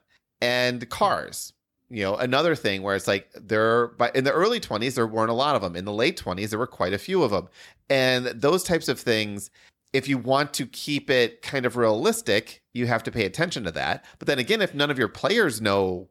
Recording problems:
none

